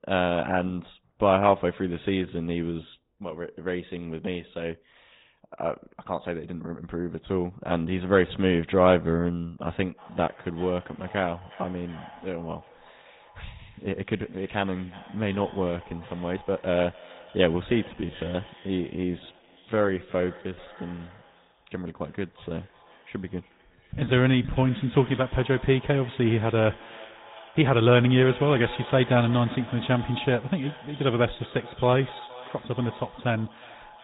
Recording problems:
high frequencies cut off; severe; nothing above 3.5 kHz
echo of what is said; noticeable; from 10 s on; 360 ms later, 15 dB below the speech
garbled, watery; slightly
uneven, jittery; strongly; from 3 to 32 s

